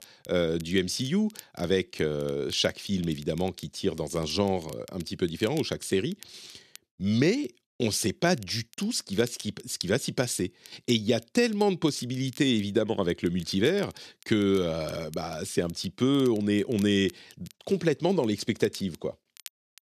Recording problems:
crackle, like an old record; faint; 25 dB below the speech

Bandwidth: 13.5 kHz